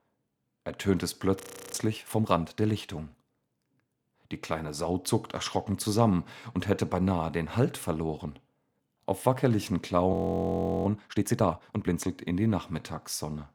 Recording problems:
audio freezing; at 1.5 s and at 10 s for 0.5 s

